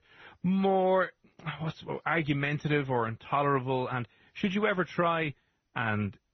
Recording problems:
garbled, watery; slightly; nothing above 6 kHz

